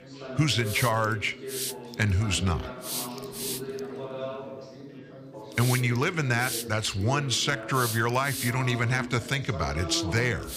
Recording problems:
hiss; loud; throughout; 8 dB below the speech
background chatter; noticeable; throughout; 4 voices, 10 dB below the speech

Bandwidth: 15 kHz